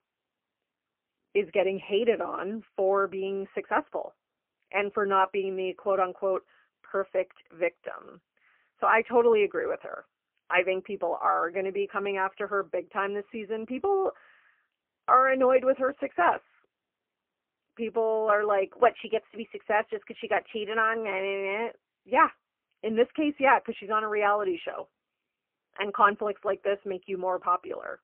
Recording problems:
phone-call audio; poor line; nothing above 3 kHz

